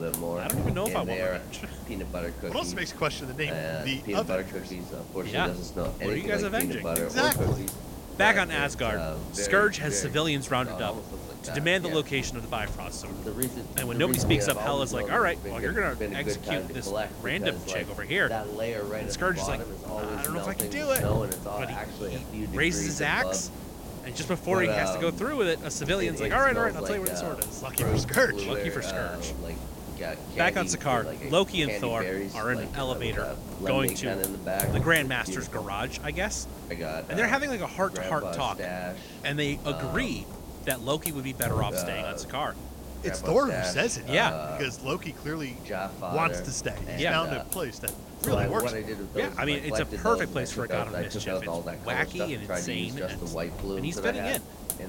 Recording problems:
voice in the background; loud; throughout; 5 dB below the speech
hiss; loud; throughout; 7 dB below the speech

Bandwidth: 16.5 kHz